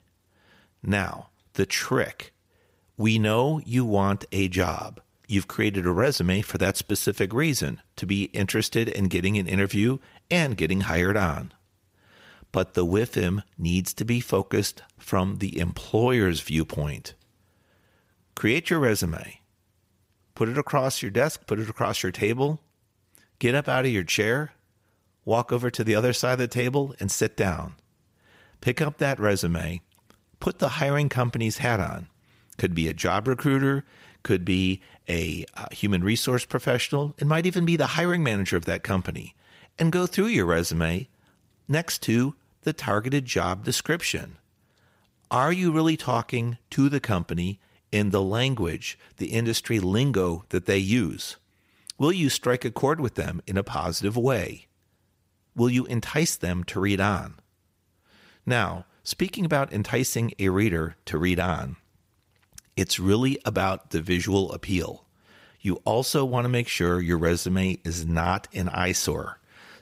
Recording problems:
none

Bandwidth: 15.5 kHz